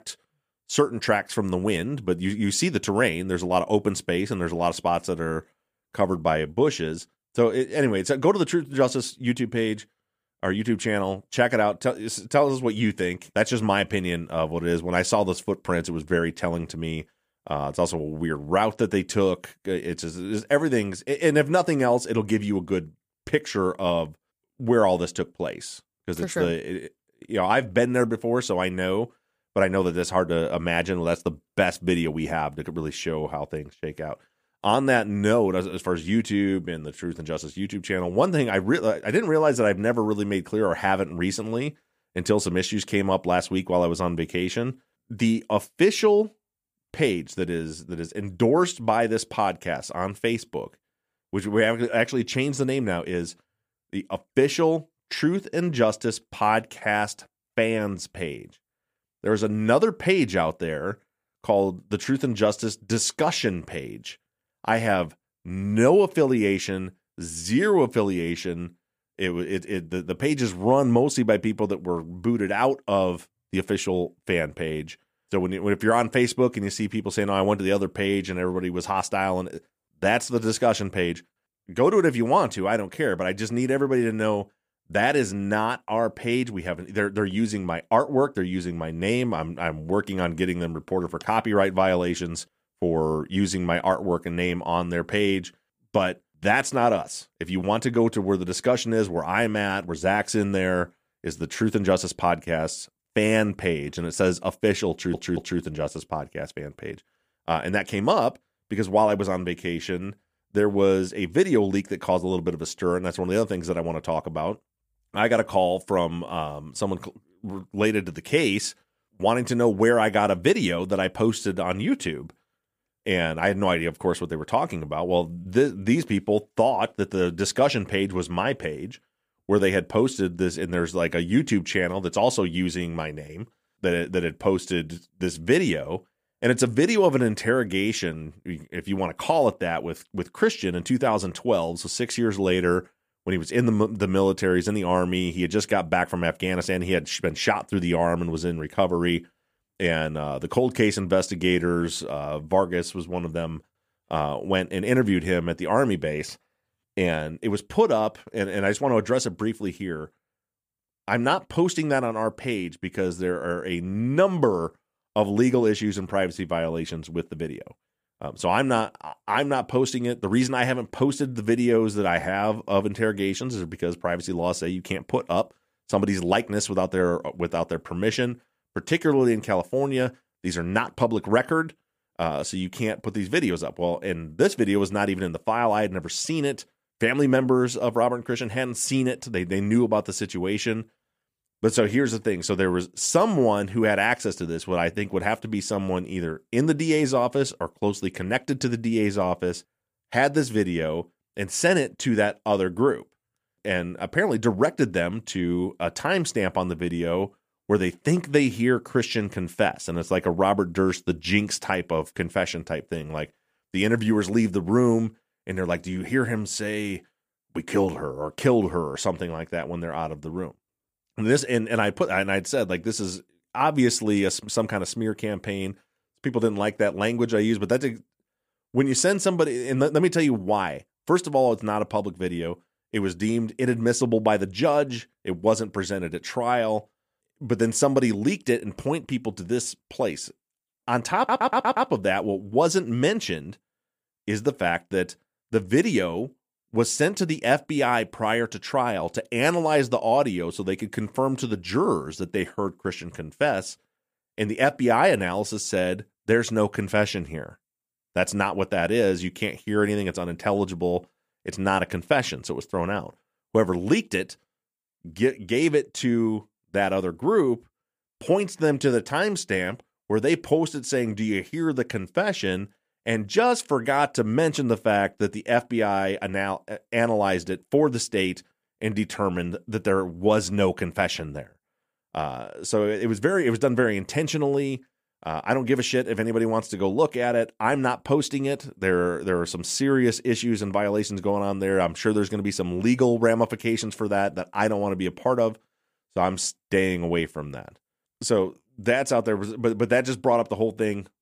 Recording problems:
audio stuttering; at 1:45 and at 4:01

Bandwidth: 15 kHz